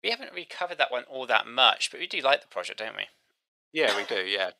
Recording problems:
thin; very; fading below 550 Hz

